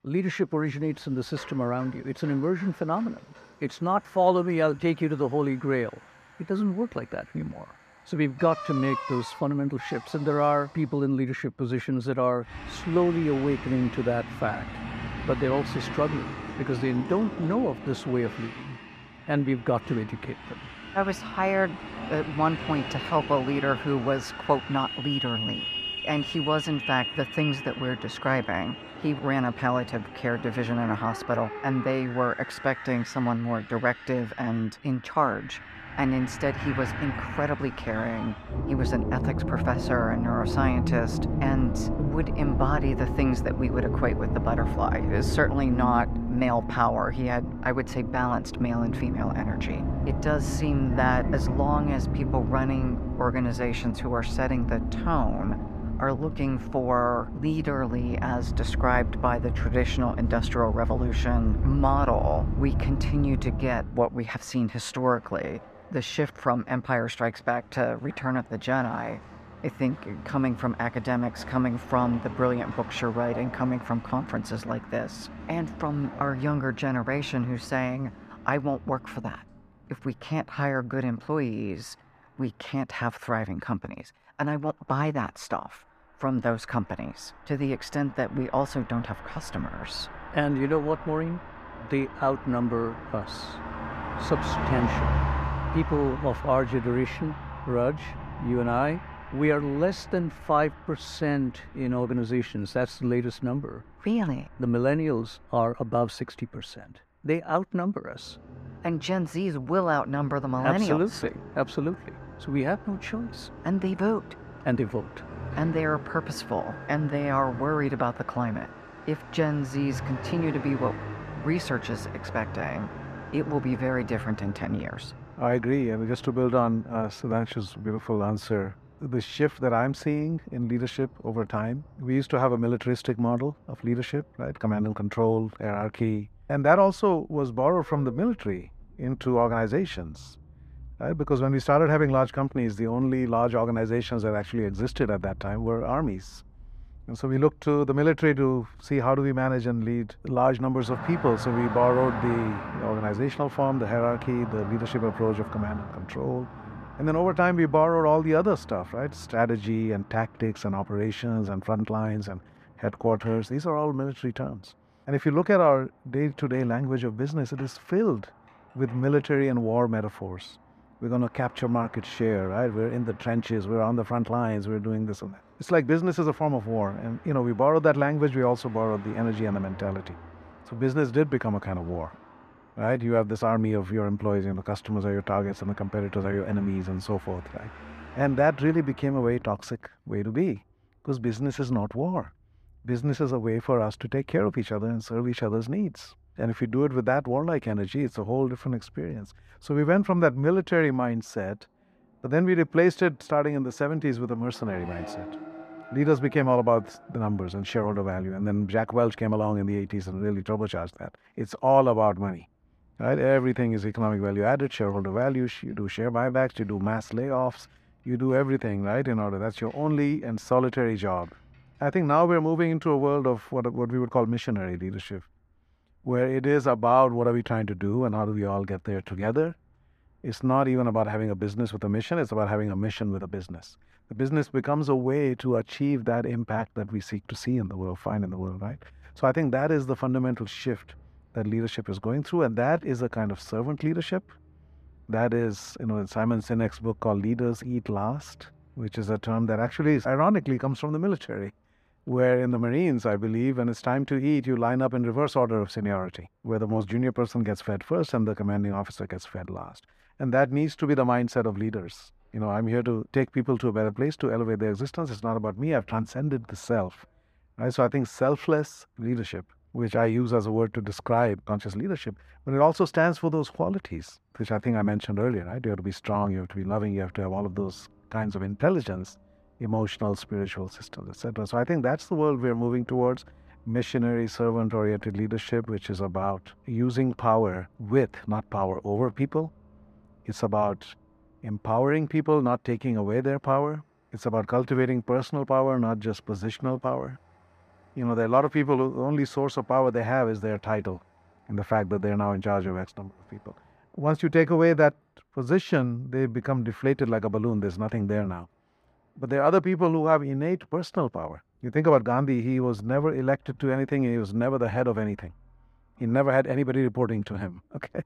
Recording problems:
muffled; slightly; fading above 2.5 kHz
traffic noise; loud; throughout; 8 dB below the speech

